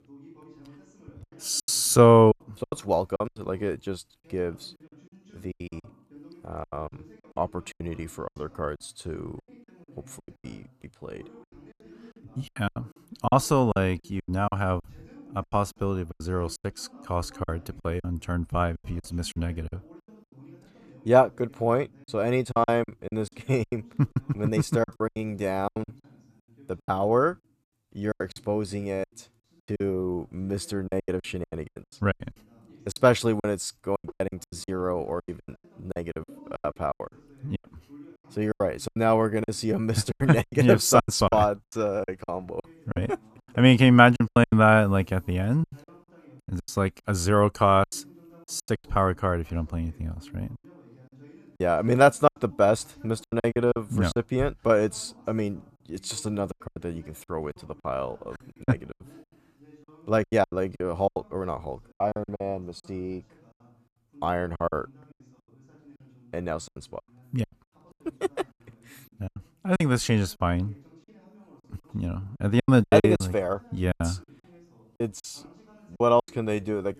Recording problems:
voice in the background; faint; throughout; 30 dB below the speech
choppy; very; 15% of the speech affected

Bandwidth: 14.5 kHz